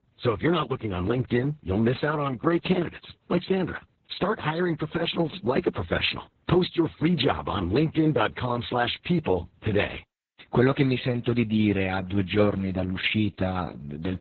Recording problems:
garbled, watery; badly; nothing above 4 kHz

